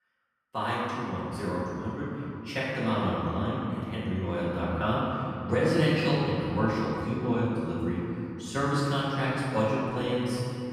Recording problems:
room echo; strong; dies away in 3 s
off-mic speech; far

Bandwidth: 14.5 kHz